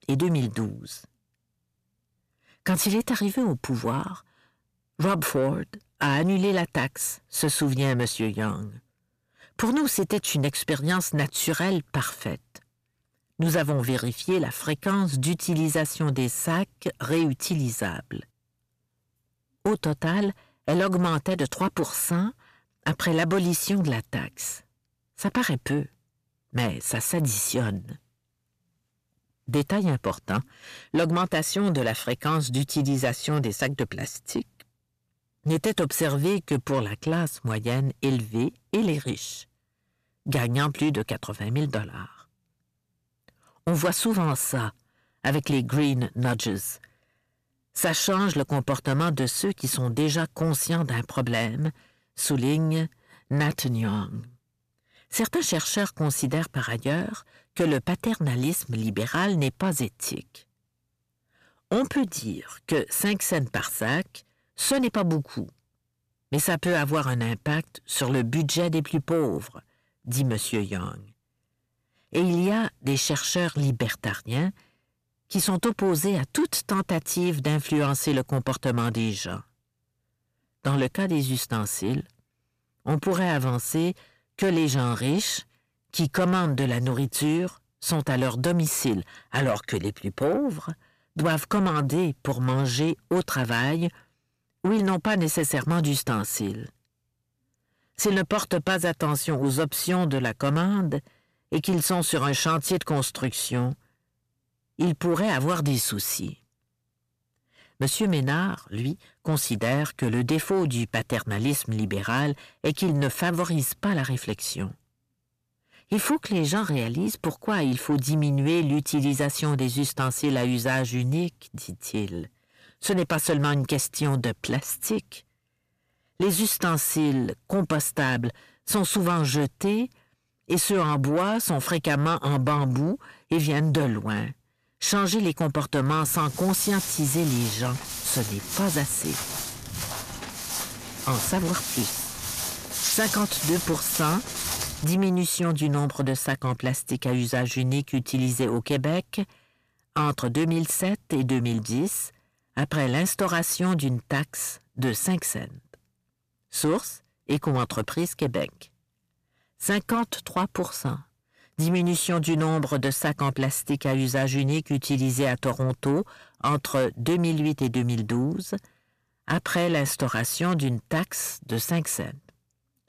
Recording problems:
distortion; slight; 10 dB below the speech
footsteps; loud; from 2:16 to 2:25; peak 2 dB above the speech

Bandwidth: 14.5 kHz